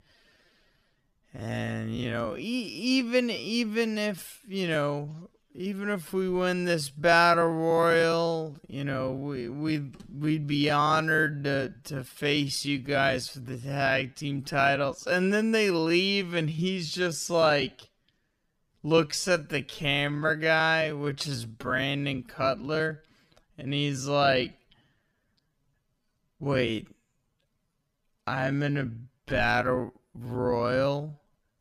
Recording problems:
wrong speed, natural pitch; too slow; 0.5 times normal speed

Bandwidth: 15 kHz